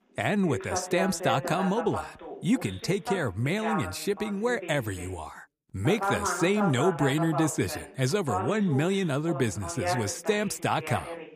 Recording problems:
voice in the background; loud; throughout; 7 dB below the speech

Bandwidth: 15 kHz